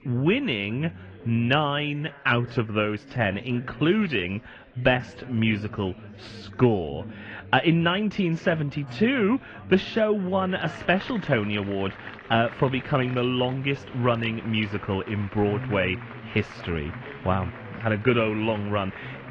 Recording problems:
muffled; very; fading above 3 kHz
garbled, watery; slightly
chatter from many people; noticeable; throughout; 15 dB below the speech

